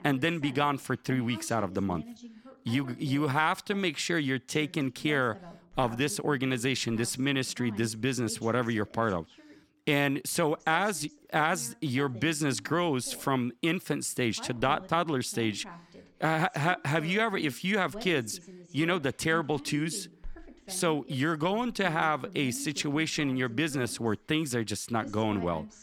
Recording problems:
voice in the background; noticeable; throughout; 20 dB below the speech

